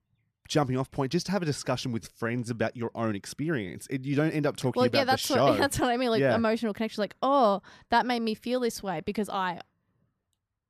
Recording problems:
uneven, jittery; slightly; from 2 to 9 s

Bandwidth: 14.5 kHz